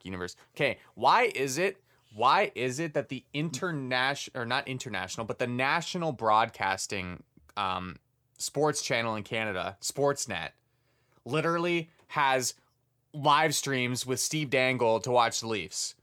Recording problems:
none

